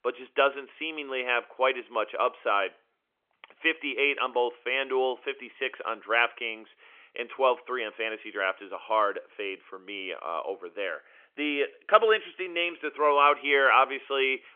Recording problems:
phone-call audio; nothing above 3.5 kHz

